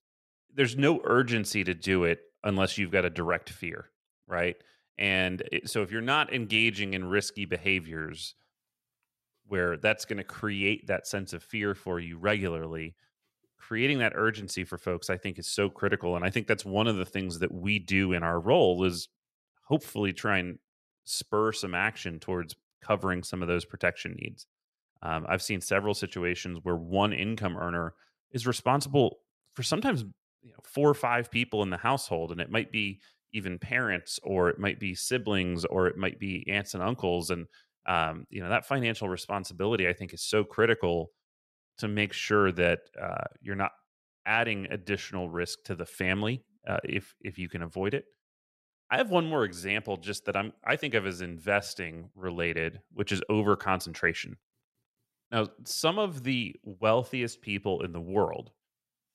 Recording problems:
none

